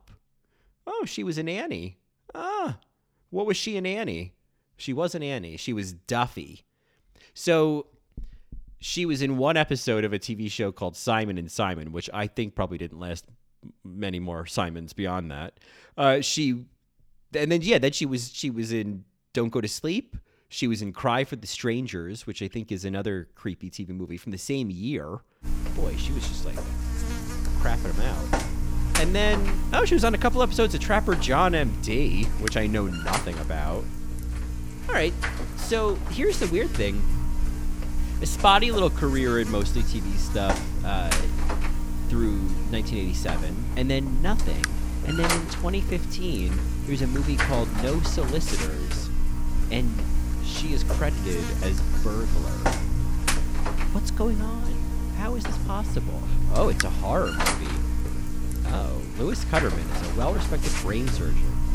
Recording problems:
electrical hum; loud; from 25 s on; 60 Hz, 6 dB below the speech

